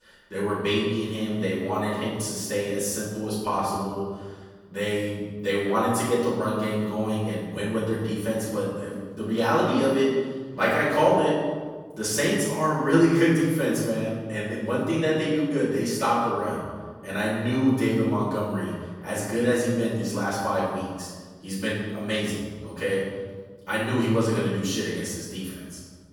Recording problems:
room echo; strong; dies away in 1.4 s
off-mic speech; far

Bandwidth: 18 kHz